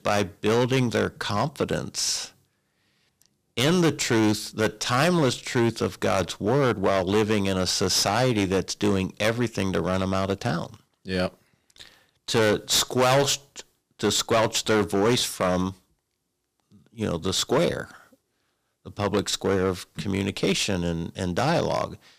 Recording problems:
distortion; heavy; 8% of the sound clipped

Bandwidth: 15 kHz